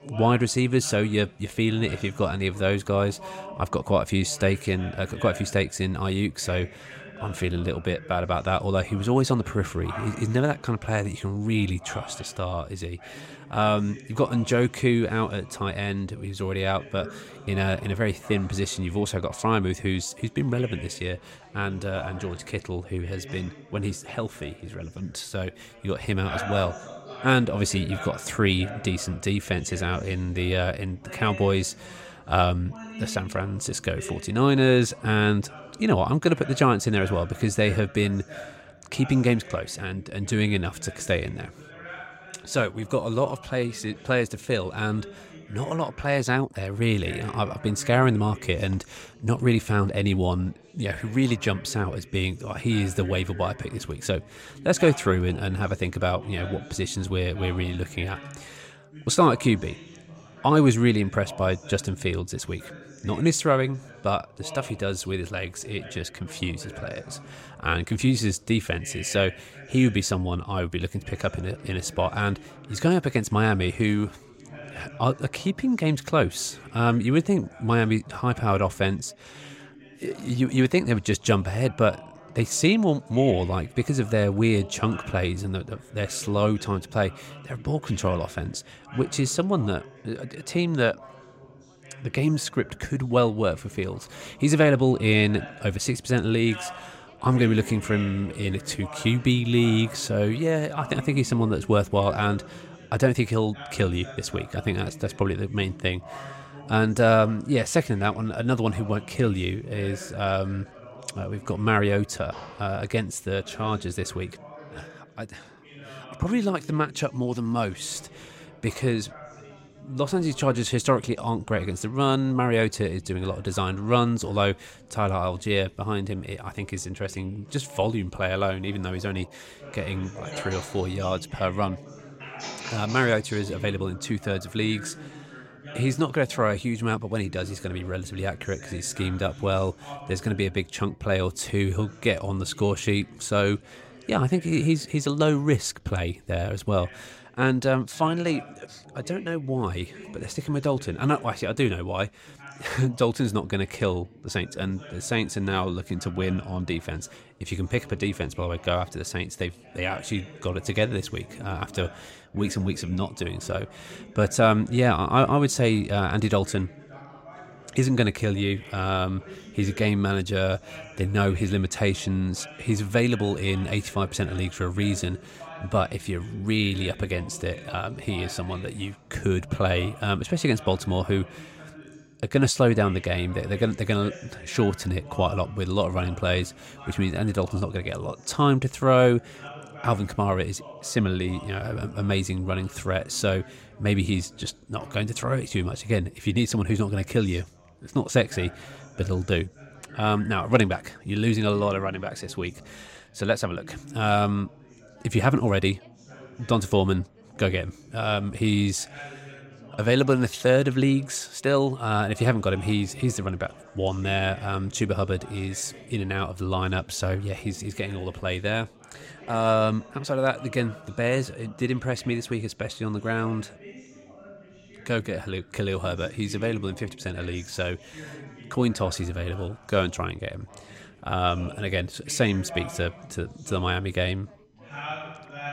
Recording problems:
background chatter; noticeable; throughout; 3 voices, 20 dB below the speech

